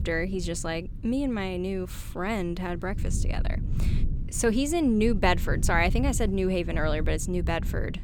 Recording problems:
low rumble; noticeable; throughout; 20 dB below the speech

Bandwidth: 18.5 kHz